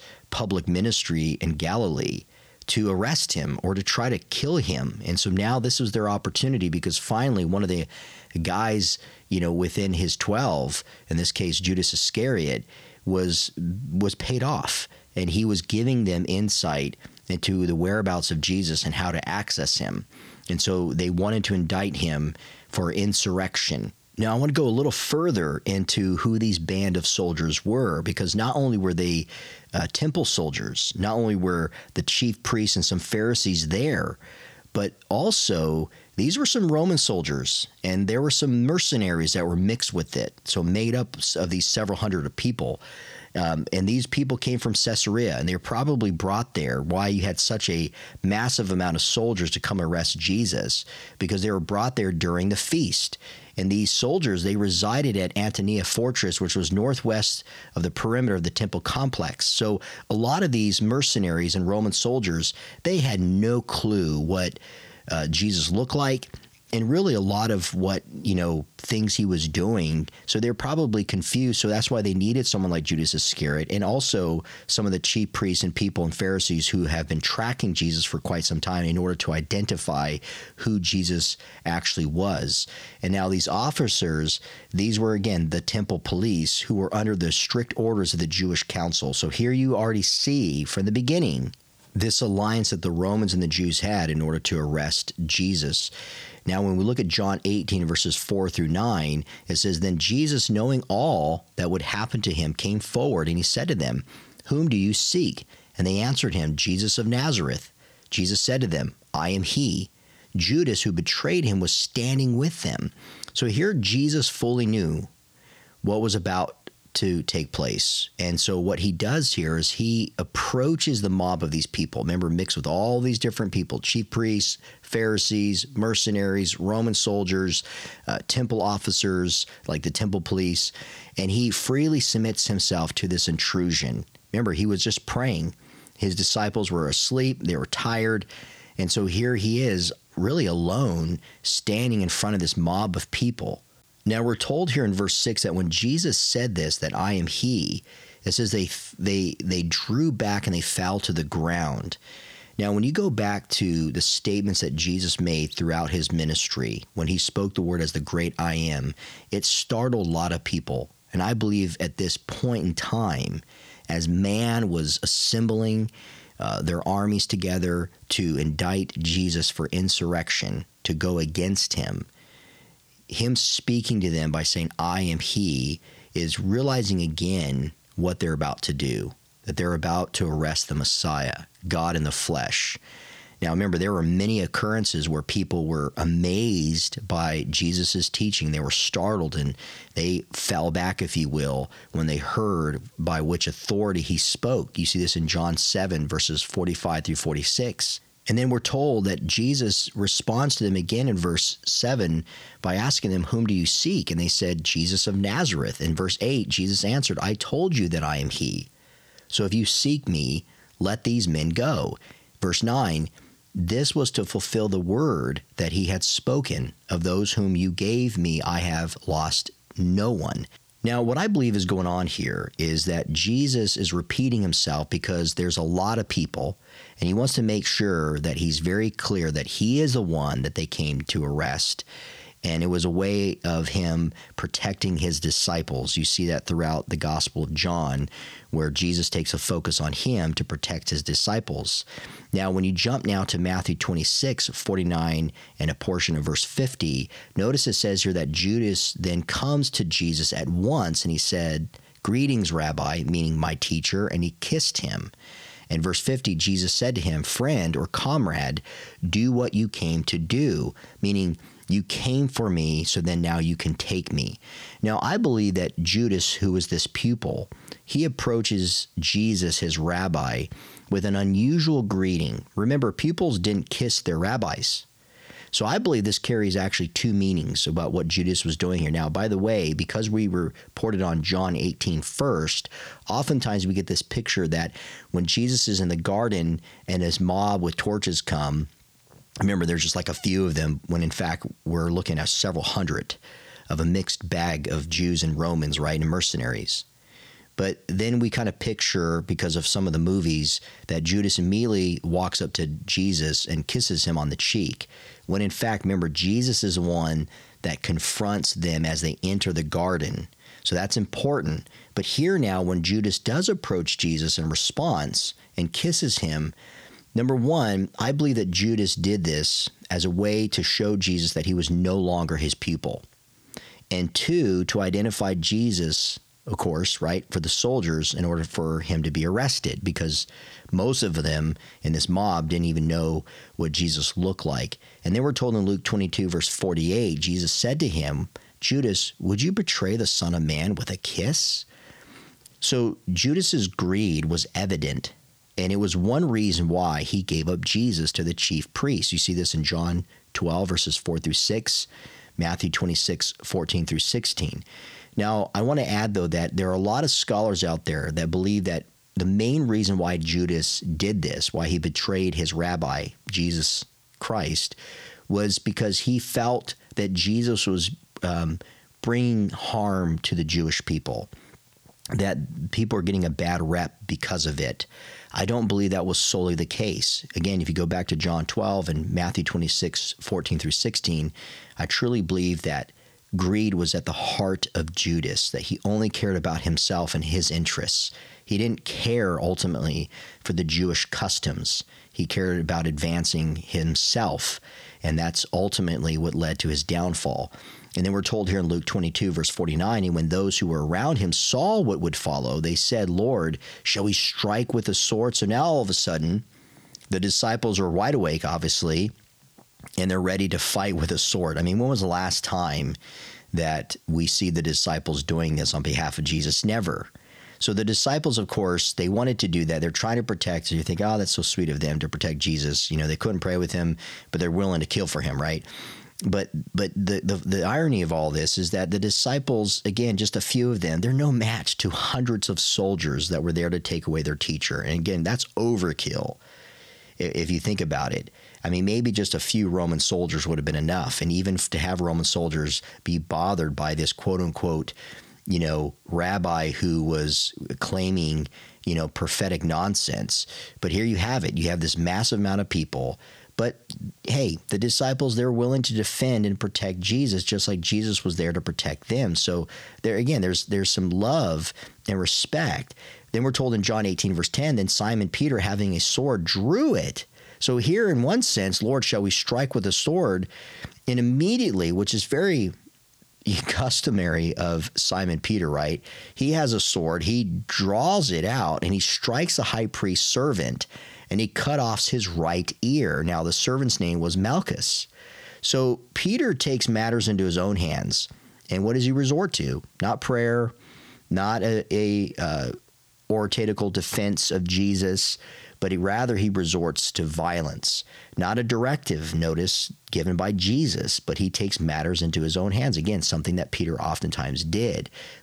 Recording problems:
squashed, flat; somewhat

